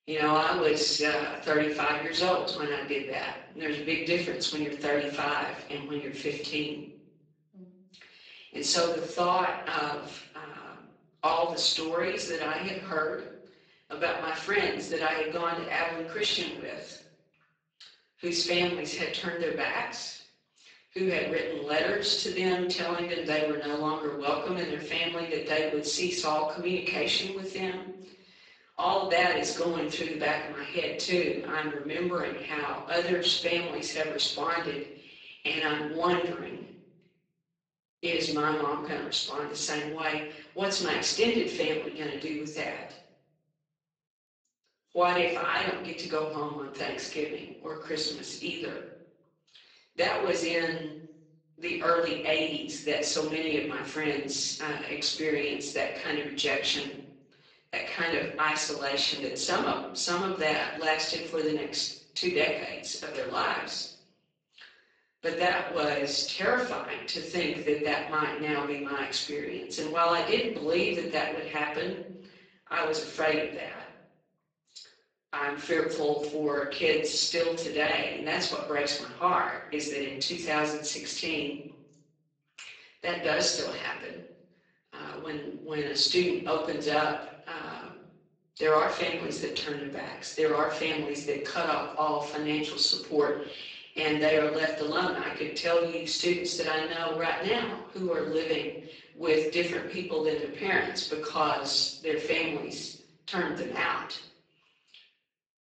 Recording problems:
off-mic speech; far
garbled, watery; badly; nothing above 7.5 kHz
room echo; noticeable; dies away in 0.8 s
thin; very slightly; fading below 350 Hz

